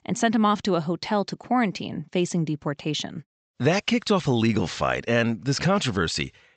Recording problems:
high frequencies cut off; noticeable; nothing above 8 kHz

